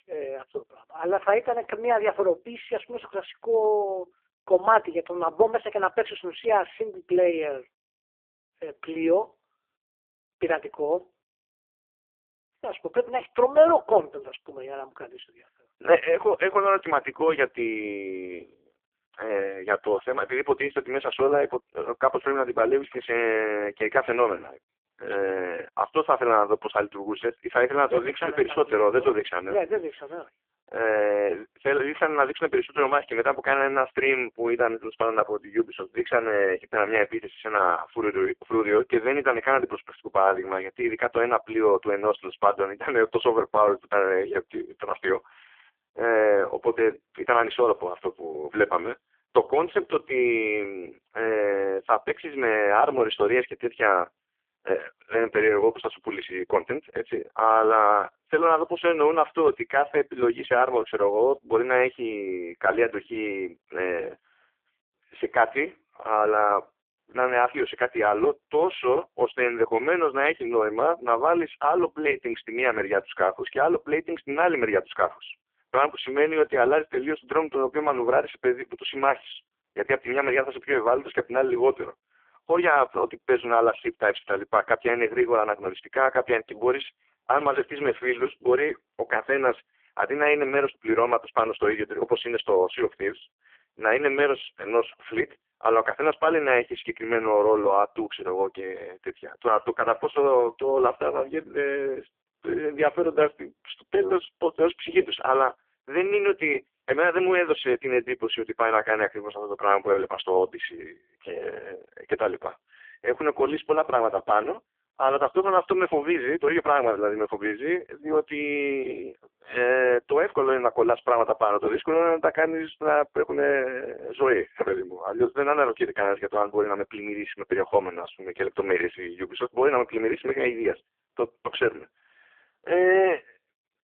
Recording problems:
phone-call audio; poor line; nothing above 3.5 kHz

